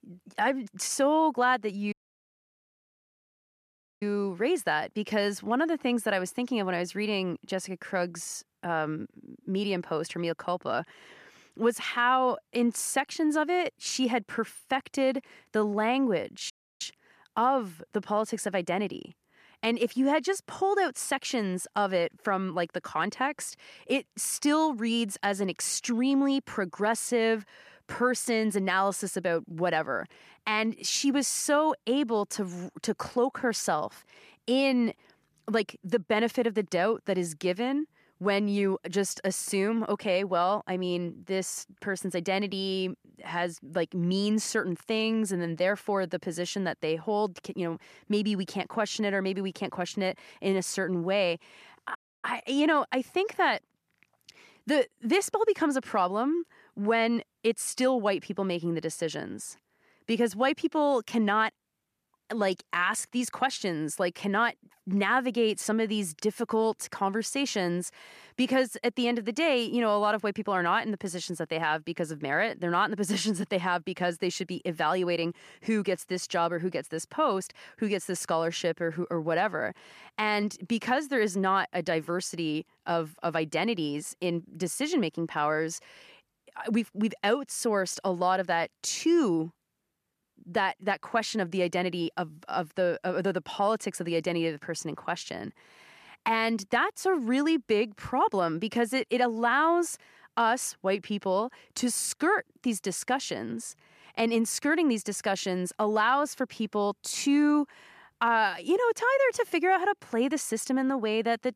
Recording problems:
audio cutting out; at 2 s for 2 s, at 17 s and at 52 s

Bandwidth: 14.5 kHz